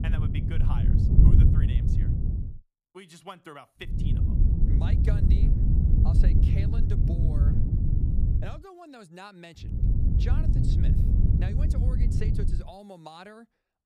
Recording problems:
wind noise on the microphone; heavy; until 2.5 s, from 4 to 8.5 s and from 9.5 to 13 s; 5 dB above the speech

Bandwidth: 15 kHz